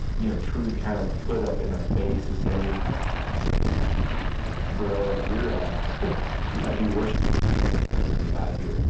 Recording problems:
distortion; heavy; 6 dB below the speech
off-mic speech; far
room echo; noticeable; dies away in 0.6 s
high frequencies cut off; noticeable; nothing above 8 kHz
wind noise on the microphone; heavy; 4 dB below the speech
rain or running water; loud; from 2.5 s on; 3 dB below the speech

